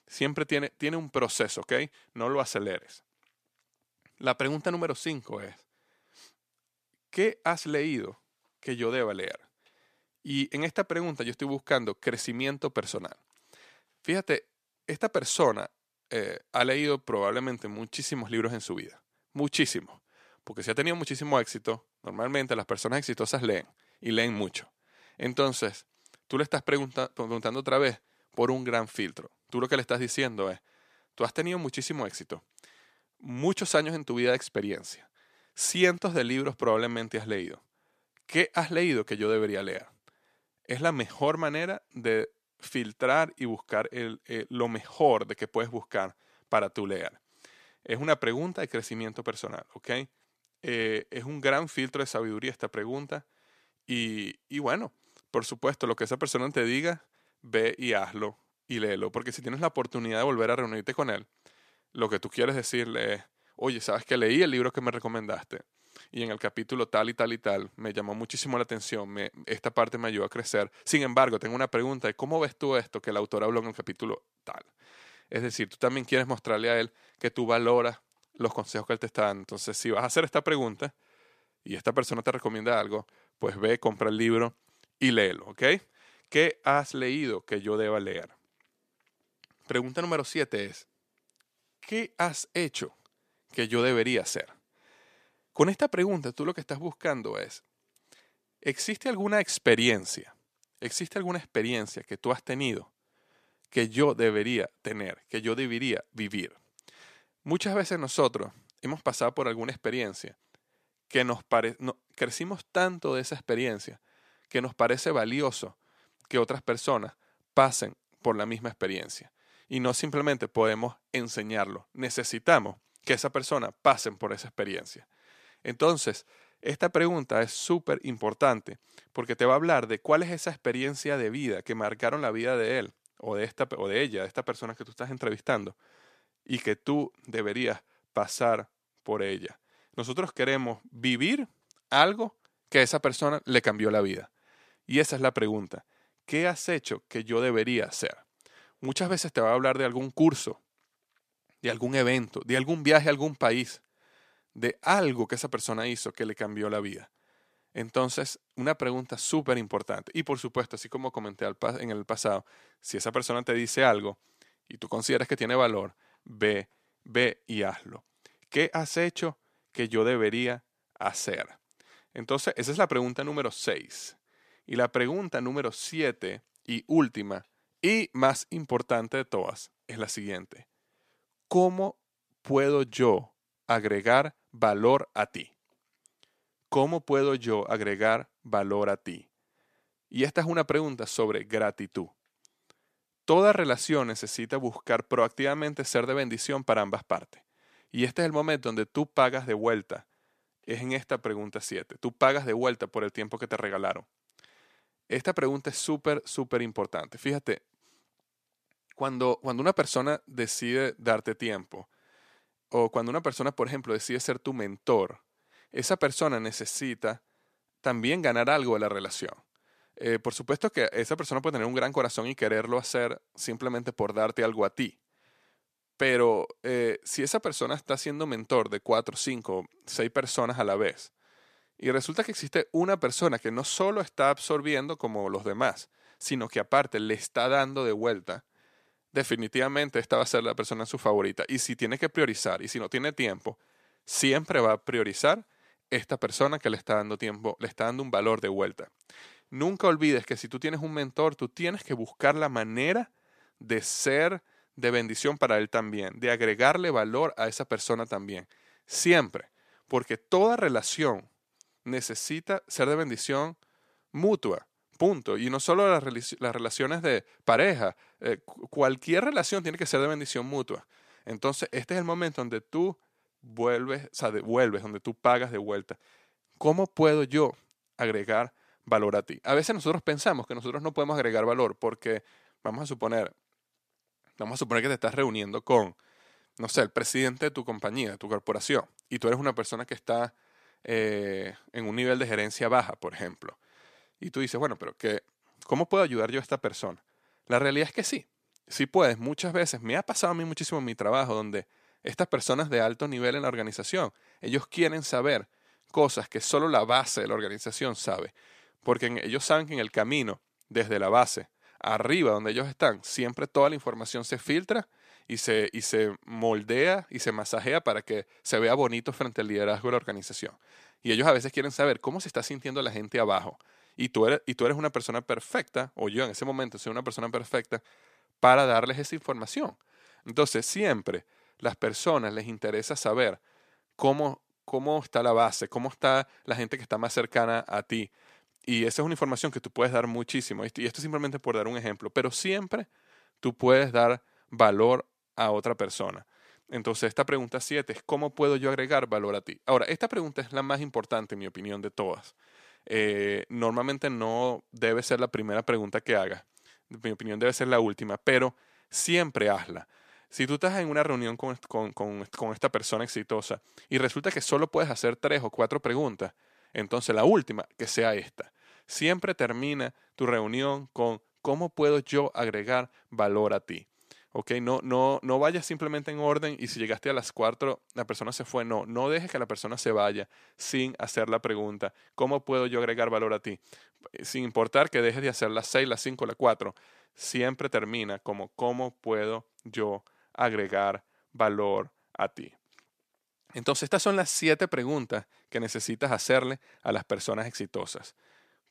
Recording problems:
none

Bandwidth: 14.5 kHz